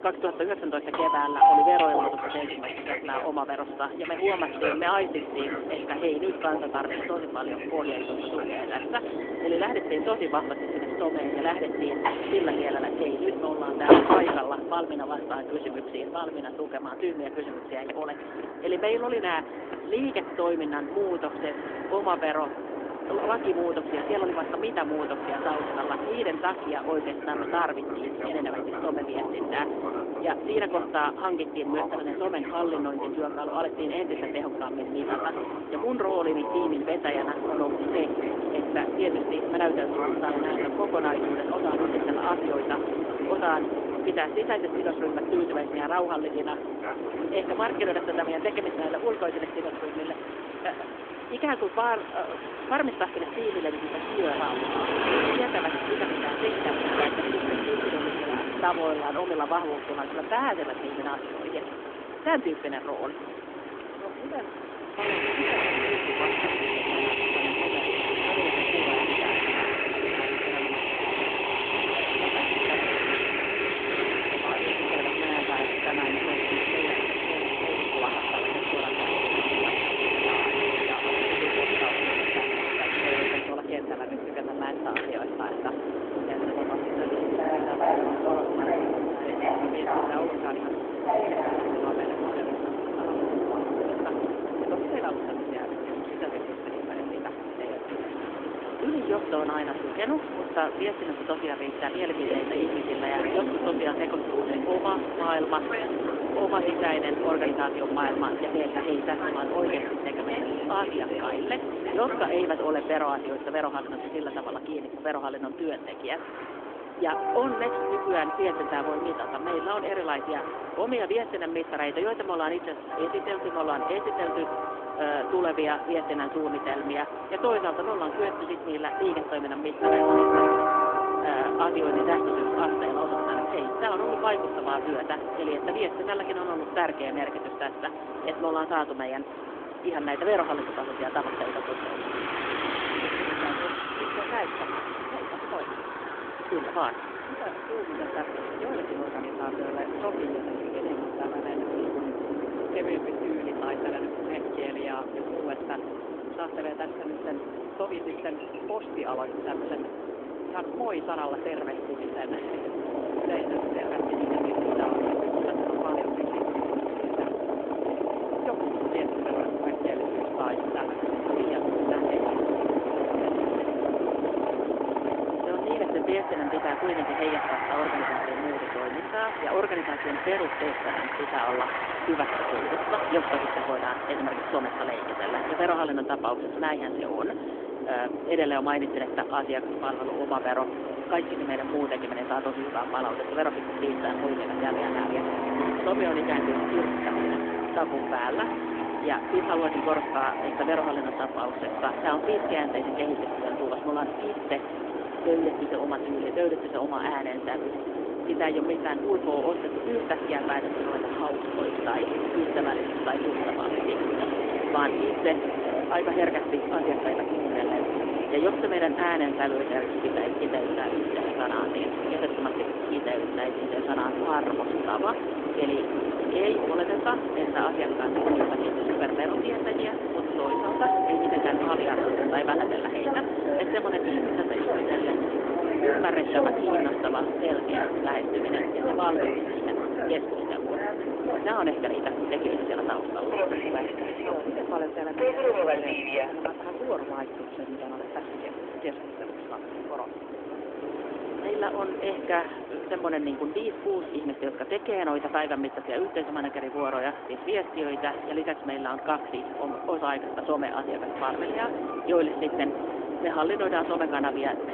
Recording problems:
phone-call audio; nothing above 3.5 kHz
train or aircraft noise; very loud; throughout; 2 dB above the speech
wind noise on the microphone; occasional gusts; from 35 s to 1:54 and from 2:41 to 3:58; 10 dB below the speech

